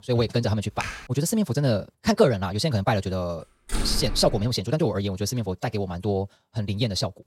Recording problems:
wrong speed, natural pitch; too fast; 1.6 times normal speed
keyboard typing; noticeable; at 1 s; peak 8 dB below the speech
door banging; noticeable; at 3.5 s; peak 5 dB below the speech

